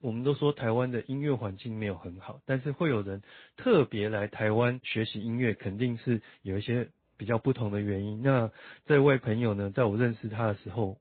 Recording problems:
high frequencies cut off; severe; nothing above 4 kHz
garbled, watery; slightly

